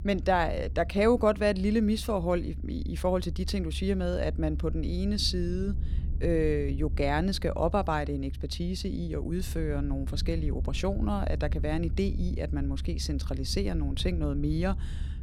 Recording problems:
low rumble; faint; throughout; 20 dB below the speech

